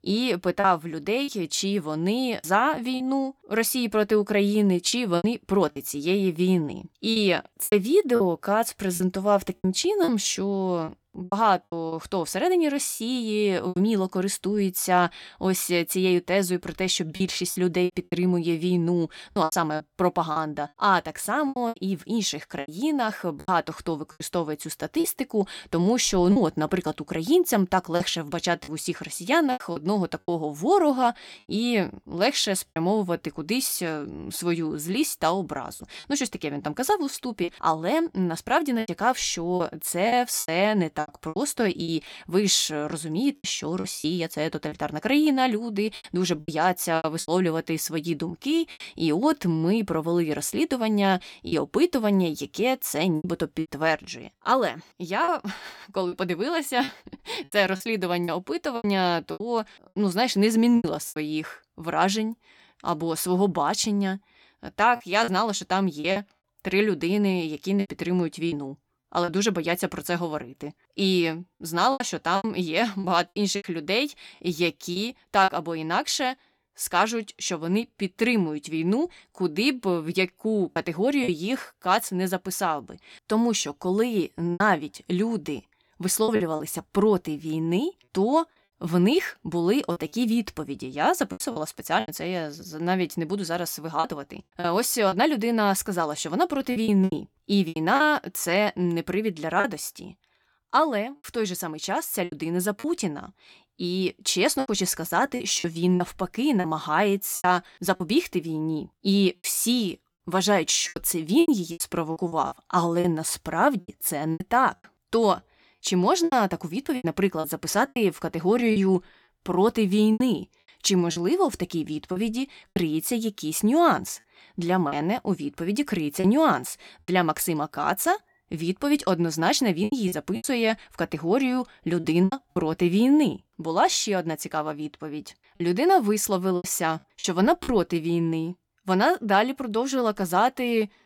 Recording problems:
choppy; very; 7% of the speech affected

